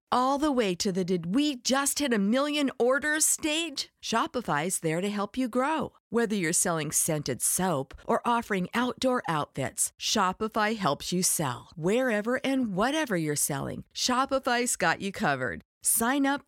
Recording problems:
none

